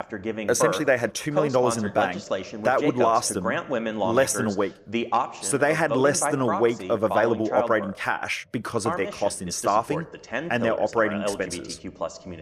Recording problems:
voice in the background; loud; throughout; 5 dB below the speech

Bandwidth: 14.5 kHz